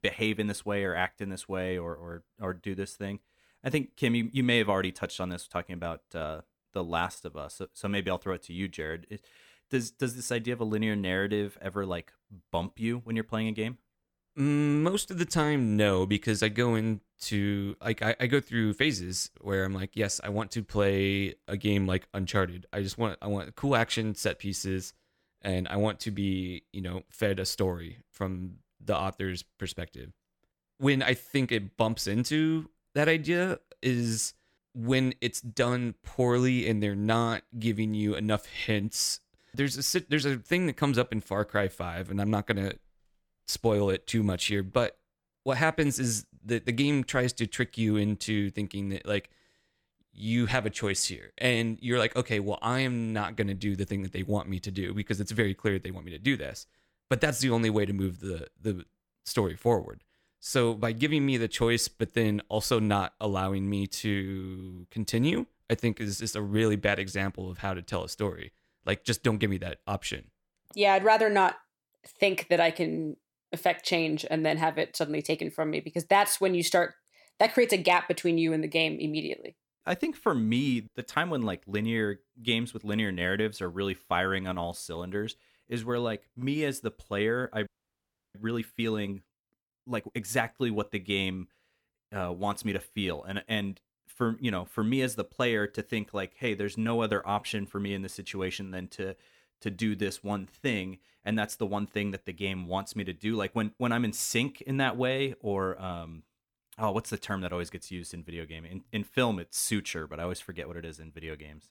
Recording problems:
audio freezing; at 1:28 for 0.5 s

